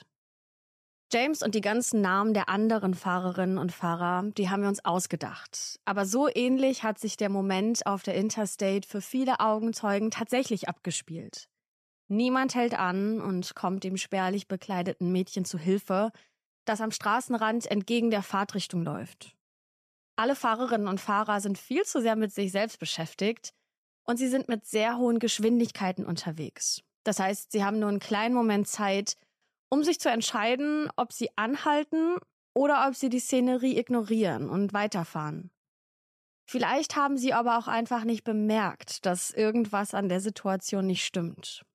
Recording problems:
none

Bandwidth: 14.5 kHz